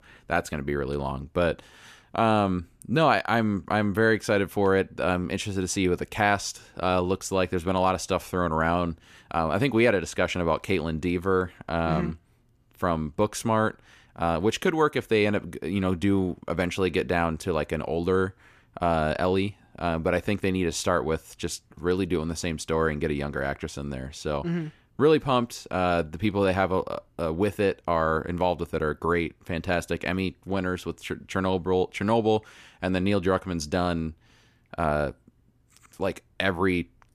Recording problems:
none

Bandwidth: 14.5 kHz